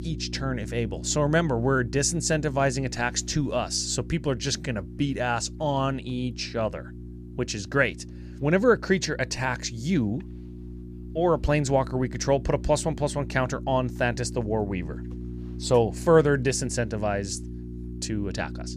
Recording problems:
electrical hum; noticeable; throughout; 60 Hz, 20 dB below the speech

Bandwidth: 14.5 kHz